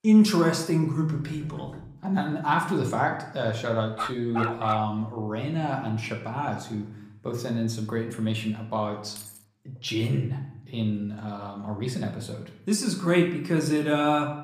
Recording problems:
room echo; slight; dies away in 0.6 s
off-mic speech; somewhat distant
door banging; faint; at 1 s; peak 15 dB below the speech
dog barking; noticeable; at 4 s; peak 2 dB below the speech
jangling keys; faint; at 9 s; peak 15 dB below the speech

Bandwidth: 15 kHz